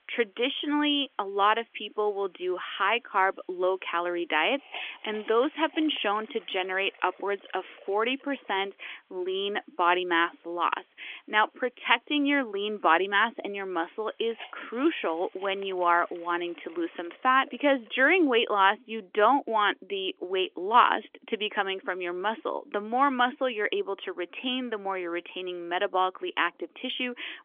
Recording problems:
phone-call audio; nothing above 3.5 kHz
hiss; faint; until 18 s; 25 dB below the speech

